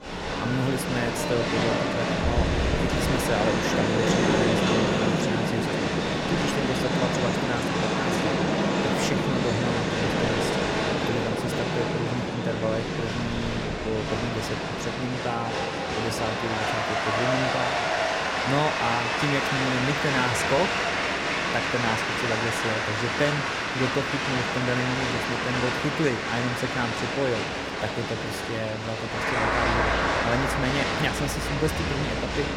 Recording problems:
crowd noise; very loud; throughout; 5 dB above the speech

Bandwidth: 16.5 kHz